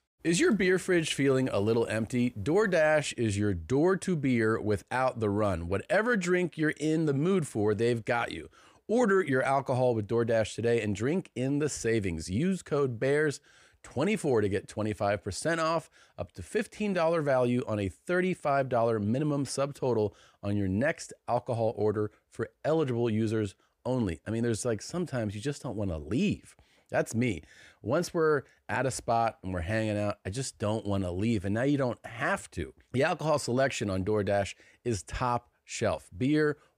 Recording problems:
none

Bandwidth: 15.5 kHz